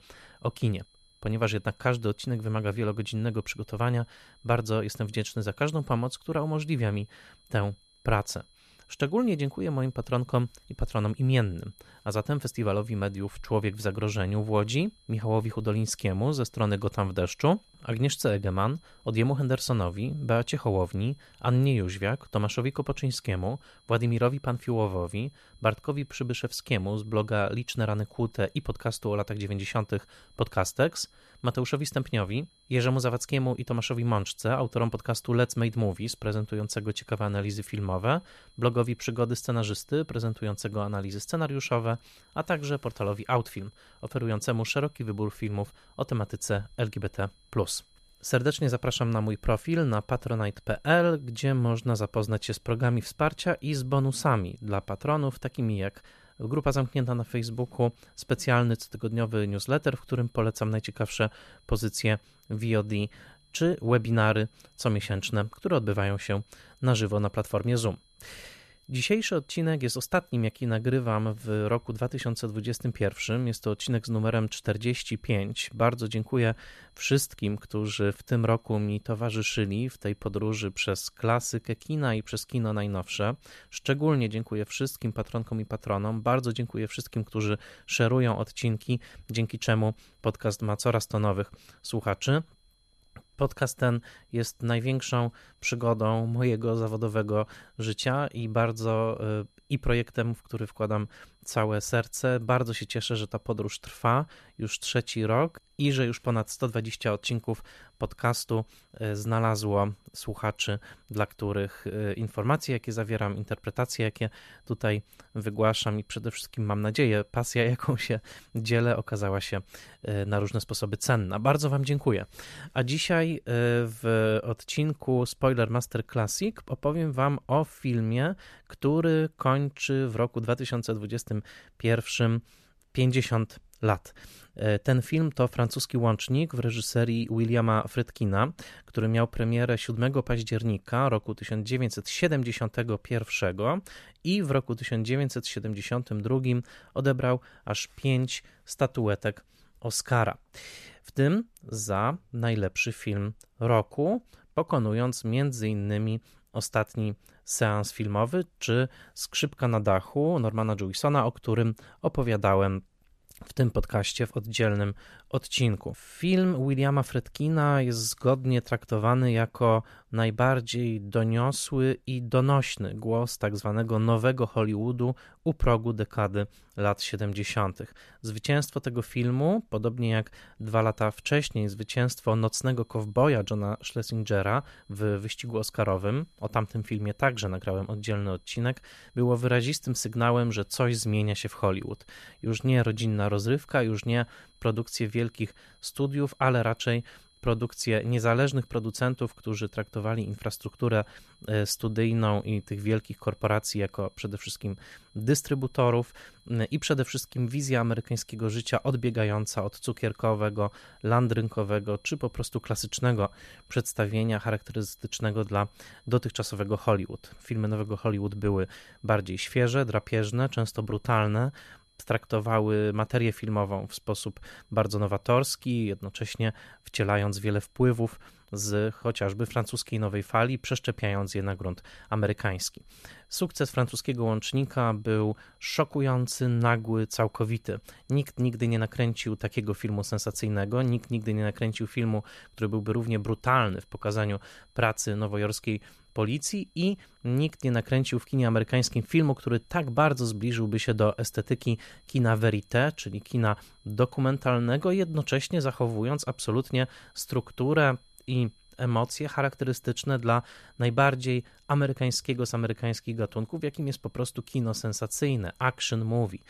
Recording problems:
high-pitched whine; faint; until 2:02 and from 3:01 on; 4 kHz, 35 dB below the speech

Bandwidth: 14 kHz